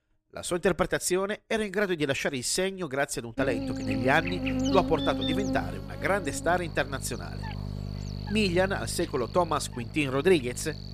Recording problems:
electrical hum; loud; from 3.5 s on; 50 Hz, 9 dB below the speech

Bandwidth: 14.5 kHz